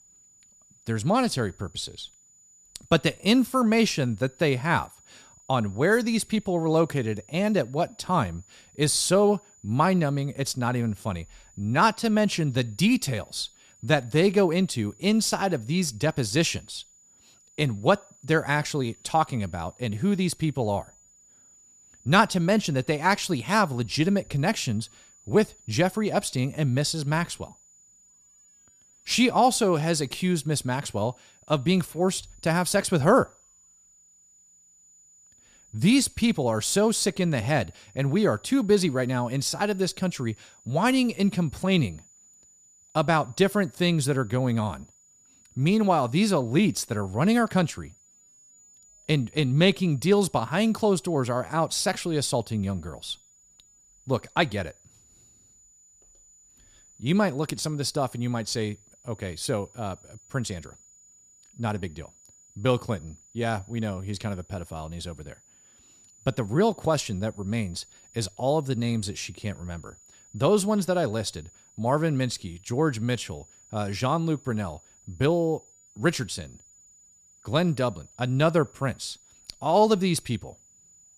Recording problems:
high-pitched whine; faint; throughout; 7 kHz, 30 dB below the speech

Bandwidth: 14.5 kHz